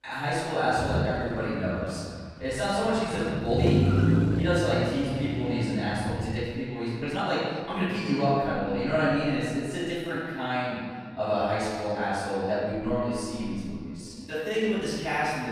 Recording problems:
room echo; strong; dies away in 1.6 s
off-mic speech; far
echo of what is said; faint; throughout; 340 ms later, 20 dB below the speech
traffic noise; very loud; until 6.5 s; as loud as the speech
uneven, jittery; strongly; from 1 to 15 s

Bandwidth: 14.5 kHz